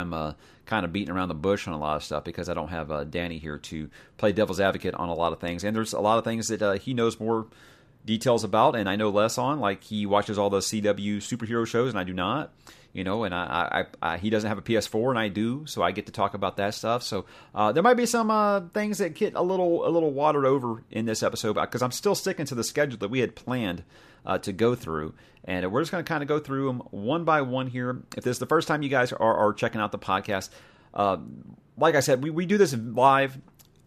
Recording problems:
abrupt cut into speech; at the start

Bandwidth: 14.5 kHz